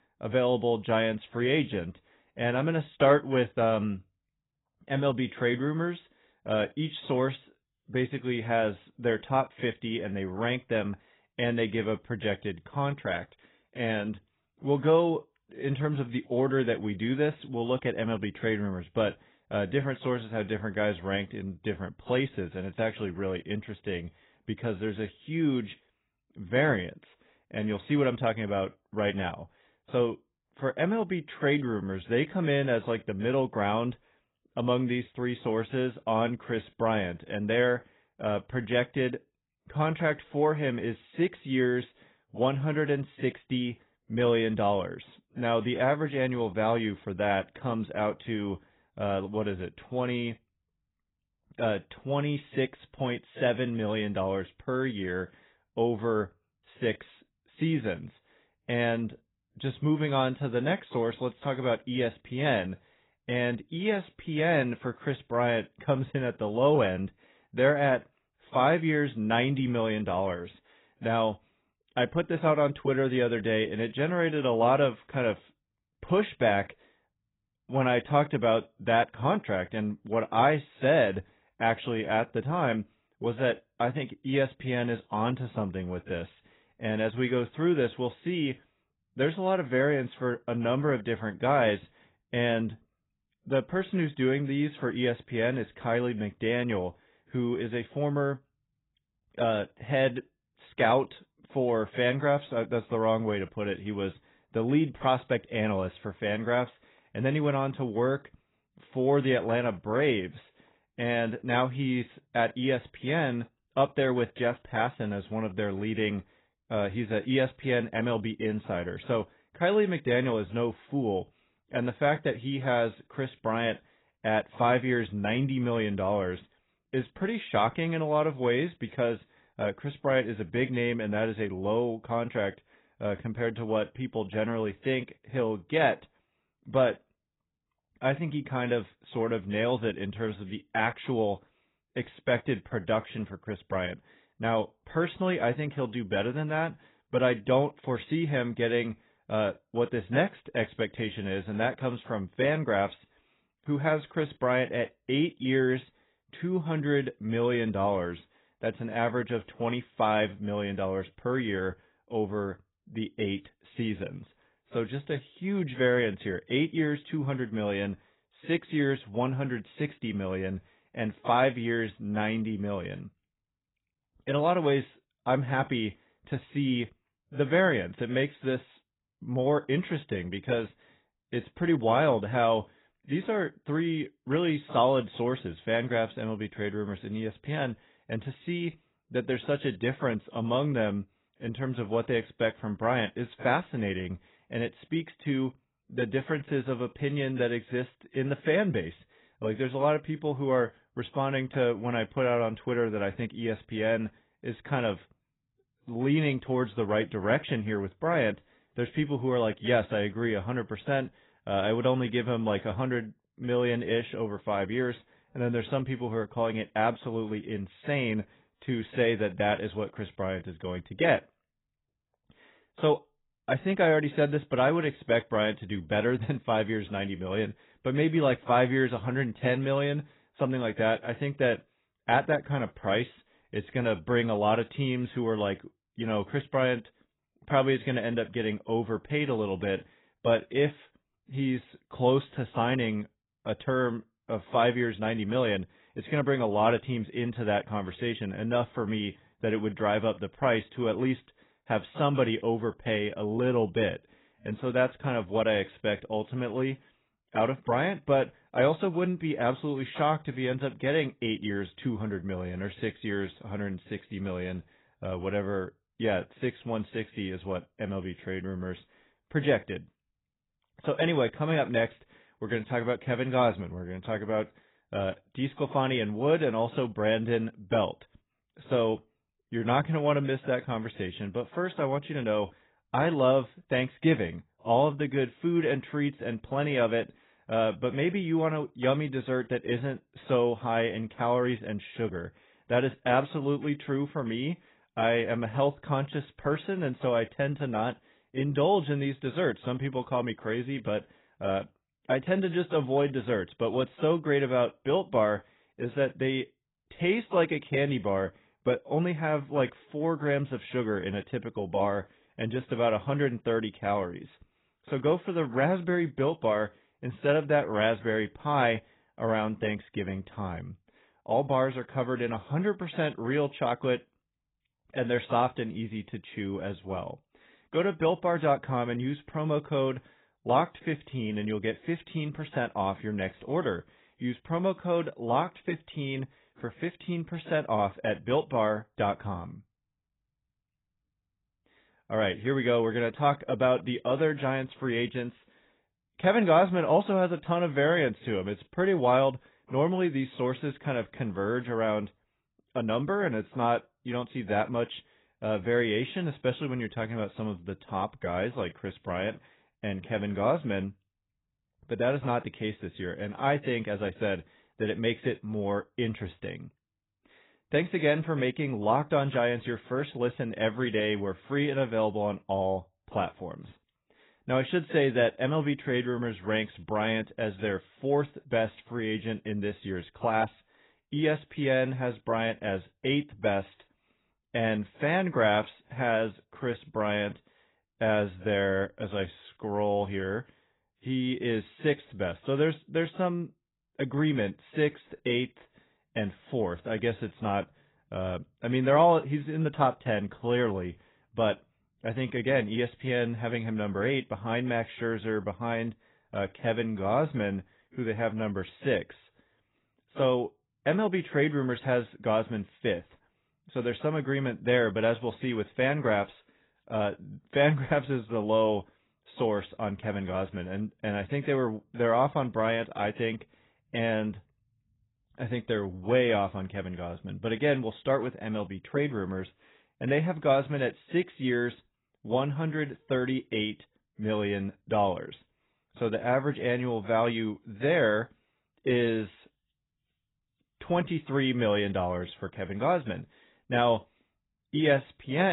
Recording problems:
garbled, watery; badly; nothing above 3.5 kHz
abrupt cut into speech; at the end

